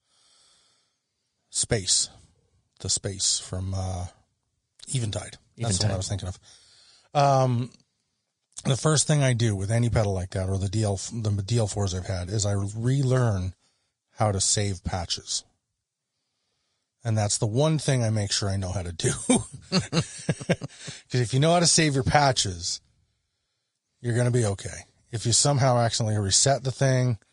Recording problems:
garbled, watery; slightly; nothing above 9.5 kHz

